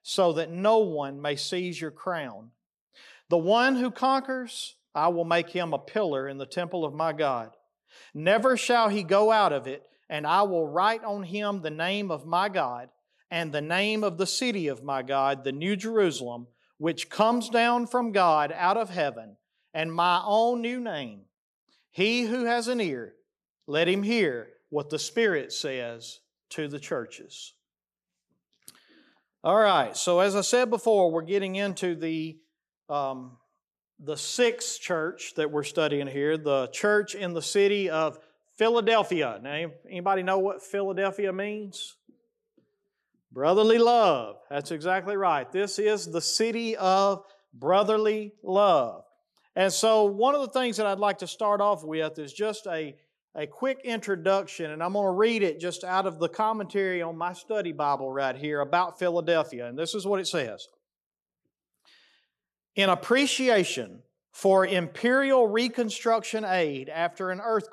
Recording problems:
none

